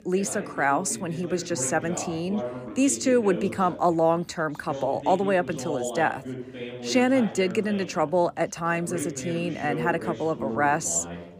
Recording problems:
background chatter; loud; throughout; 2 voices, 10 dB below the speech

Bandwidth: 15 kHz